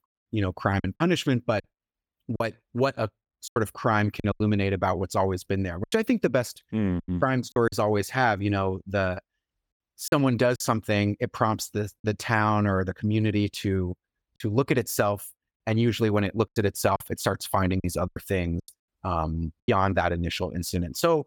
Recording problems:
choppy; very; 7% of the speech affected

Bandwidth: 18 kHz